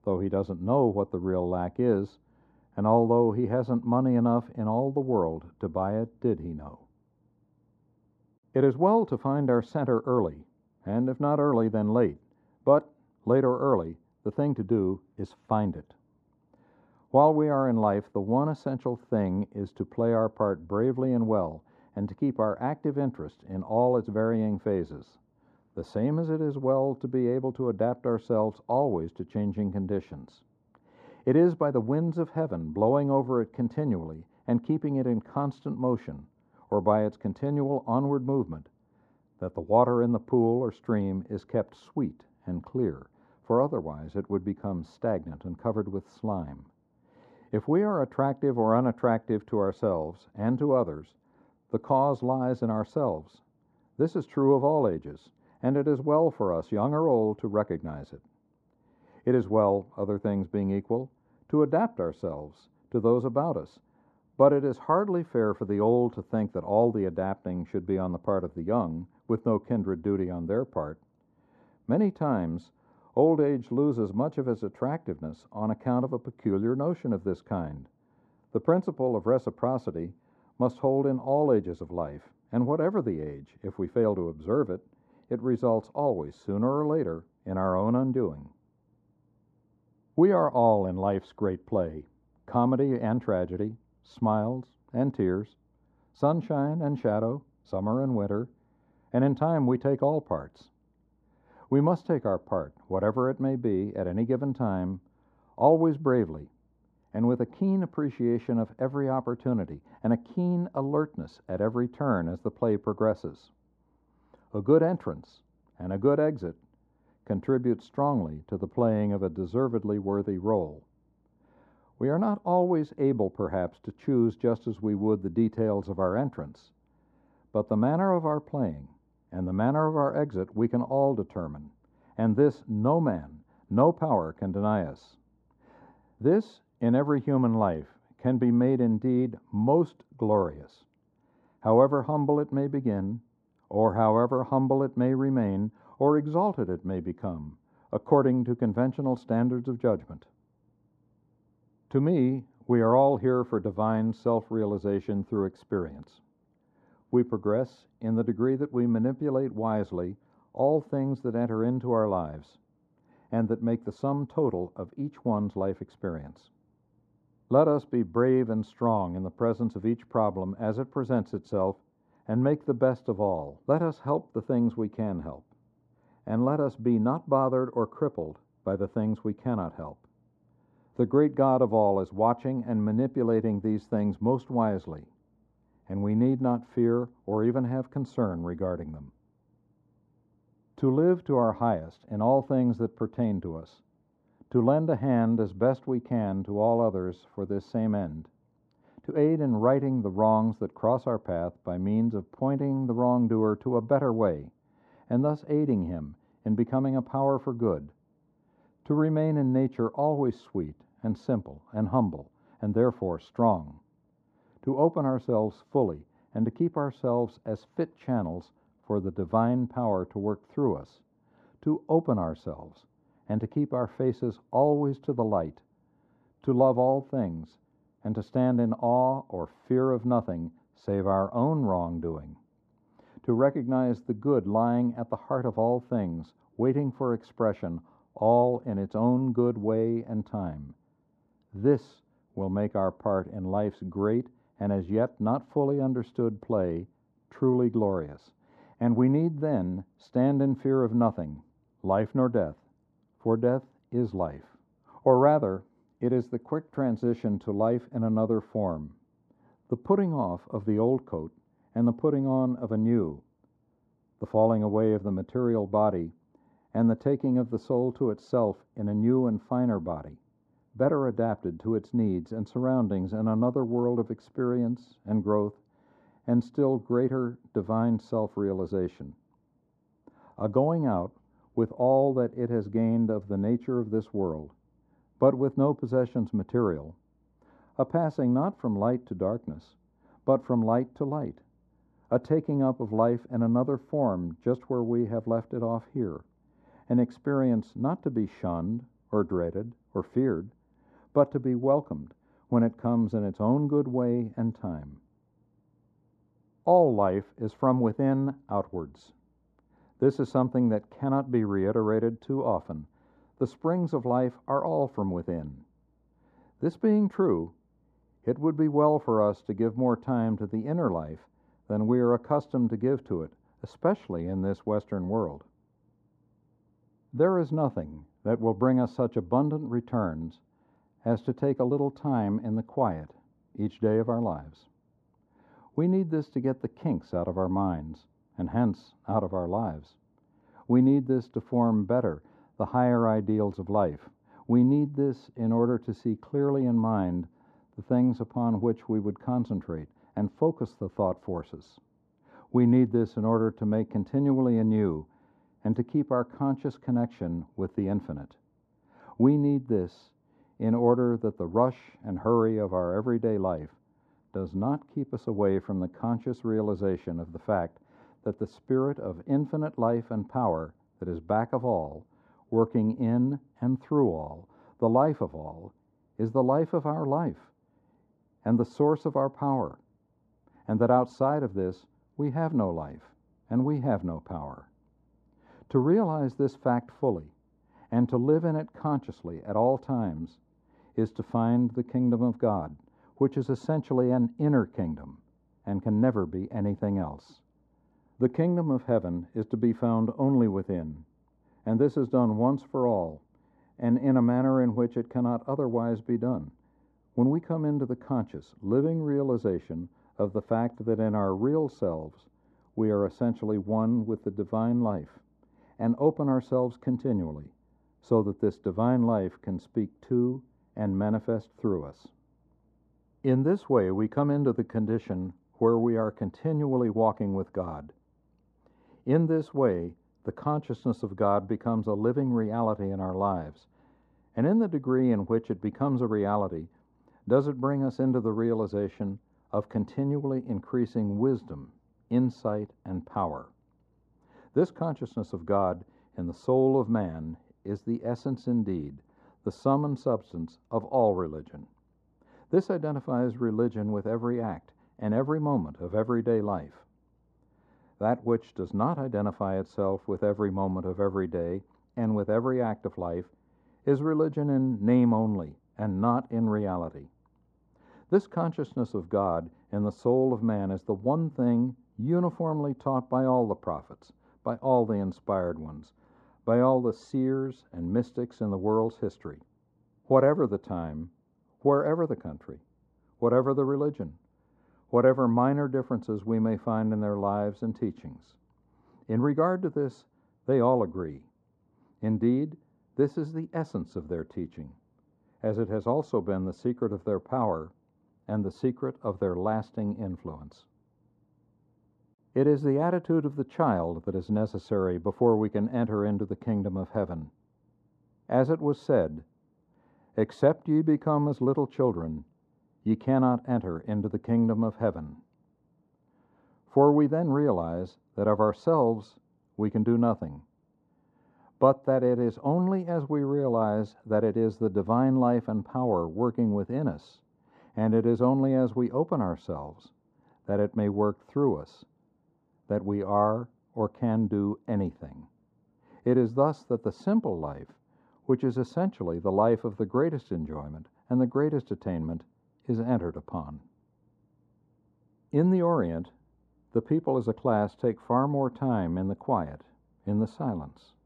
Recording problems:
muffled; very; fading above 1.5 kHz

